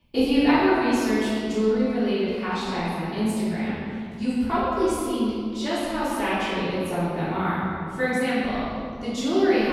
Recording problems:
room echo; strong; dies away in 2.2 s
off-mic speech; far
abrupt cut into speech; at the end

